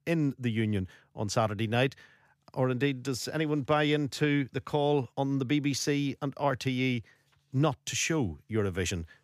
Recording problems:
none

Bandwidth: 15 kHz